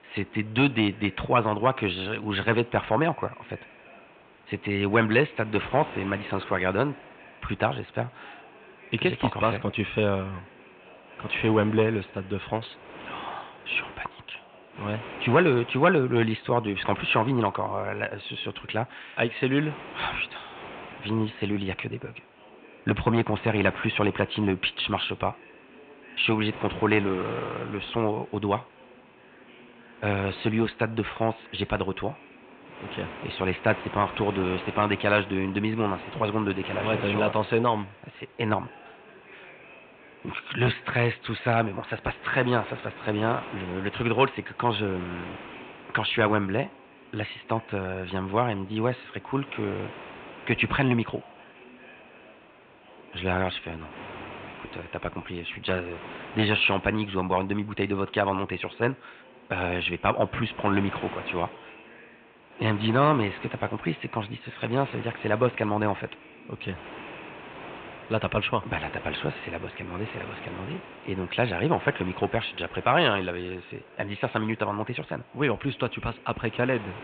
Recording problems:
high frequencies cut off; severe; nothing above 4 kHz
muffled; very slightly; fading above 2.5 kHz
thin; very slightly; fading below 400 Hz
wind noise on the microphone; occasional gusts; 15 dB below the speech
background chatter; faint; throughout; 3 voices, 25 dB below the speech

